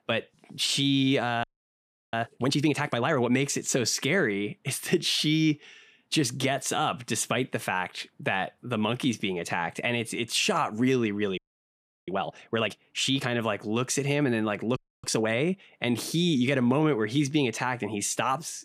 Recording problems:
audio freezing; at 1.5 s for 0.5 s, at 11 s for 0.5 s and at 15 s

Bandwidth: 14.5 kHz